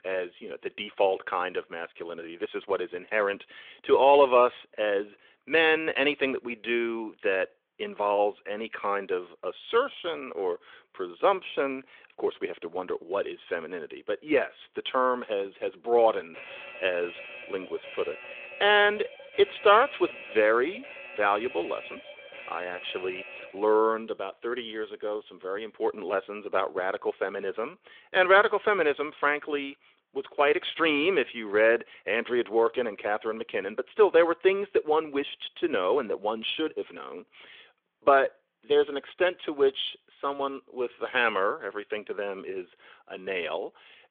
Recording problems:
phone-call audio; nothing above 3.5 kHz
alarm; faint; from 16 to 24 s; peak 15 dB below the speech

